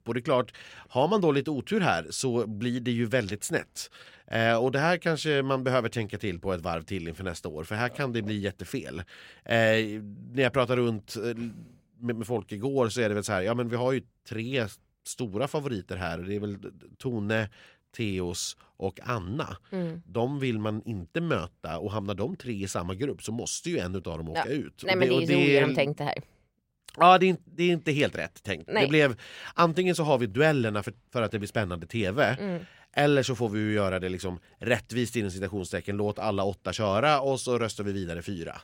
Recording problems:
none

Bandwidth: 16 kHz